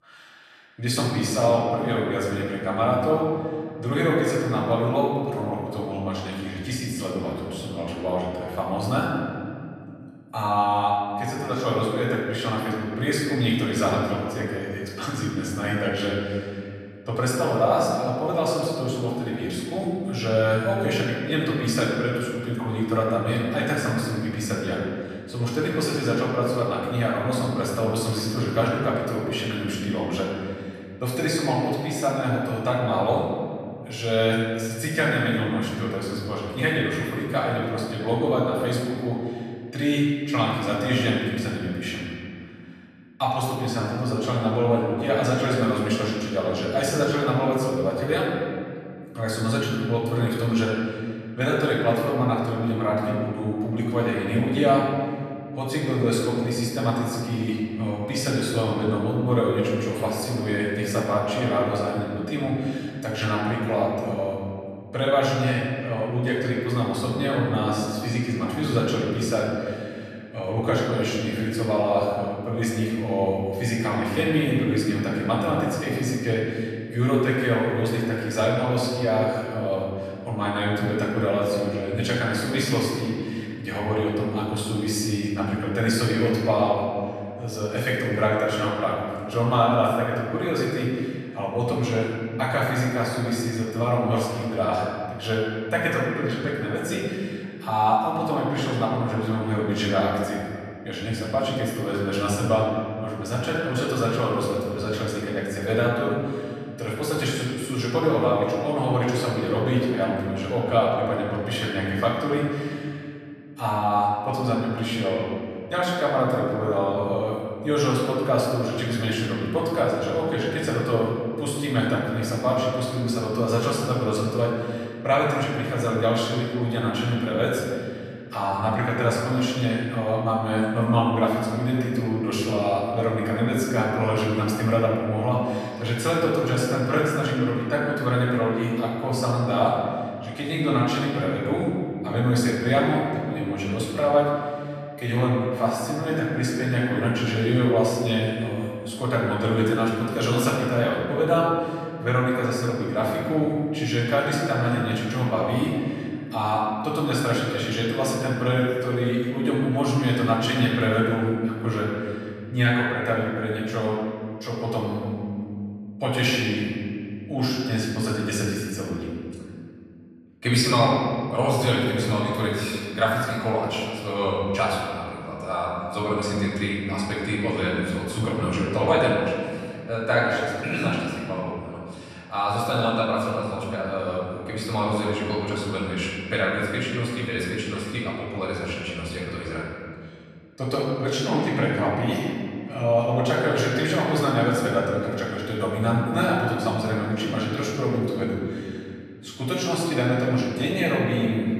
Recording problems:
off-mic speech; far
room echo; noticeable; dies away in 2.1 s

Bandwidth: 14 kHz